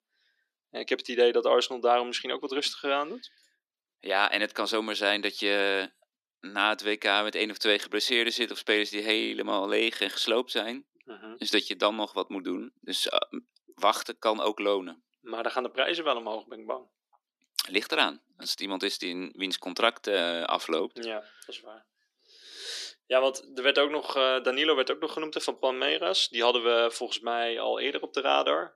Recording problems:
thin; somewhat; fading below 300 Hz

